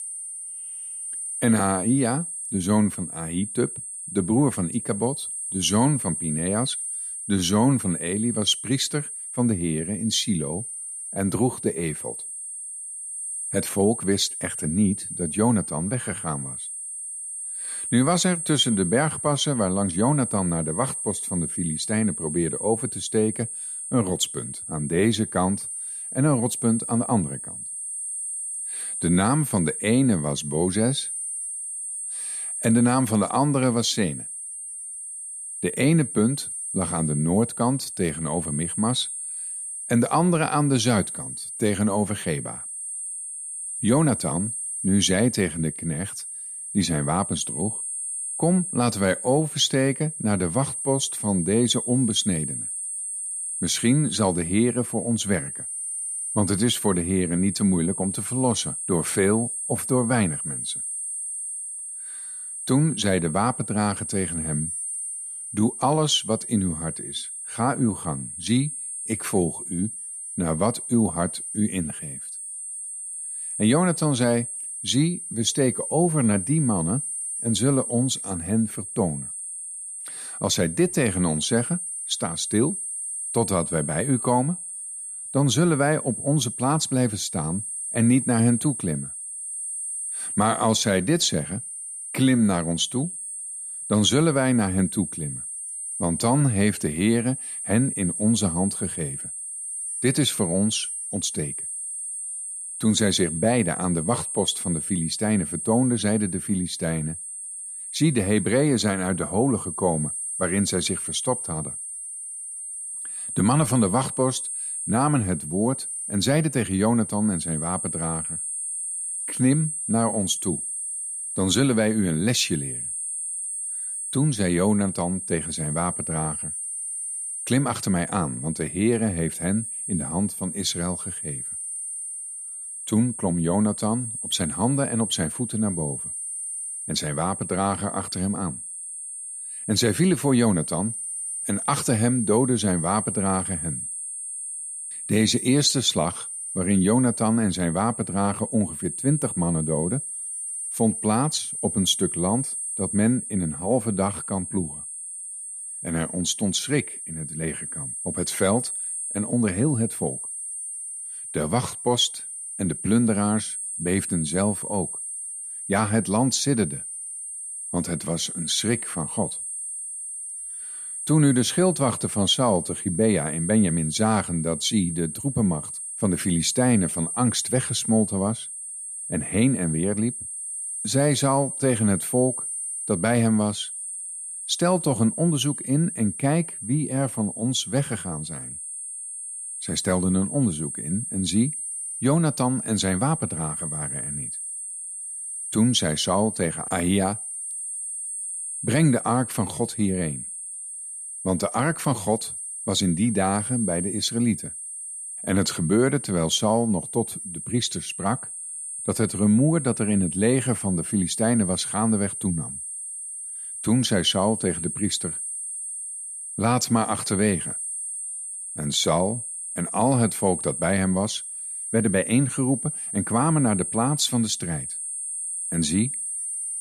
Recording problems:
high-pitched whine; loud; throughout; 8.5 kHz, 5 dB below the speech

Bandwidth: 14.5 kHz